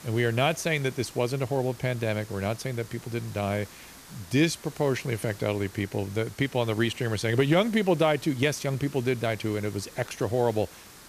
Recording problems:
hiss; noticeable; throughout; 20 dB below the speech

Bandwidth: 14.5 kHz